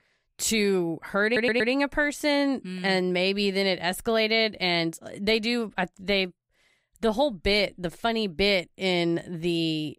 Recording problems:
audio stuttering; at 1.5 s

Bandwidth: 15.5 kHz